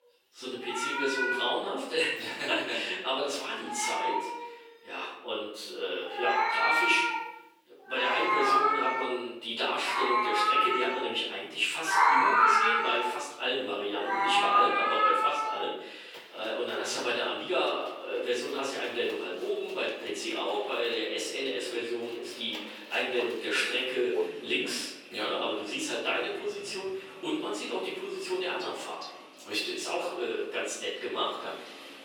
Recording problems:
off-mic speech; far
room echo; noticeable; dies away in 0.8 s
thin; somewhat; fading below 350 Hz
echo of what is said; faint; from 19 s on; 500 ms later, 20 dB below the speech
animal sounds; very loud; throughout; 4 dB above the speech

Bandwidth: 18.5 kHz